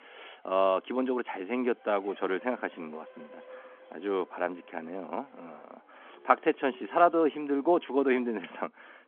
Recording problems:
phone-call audio
traffic noise; faint; throughout; 25 dB below the speech

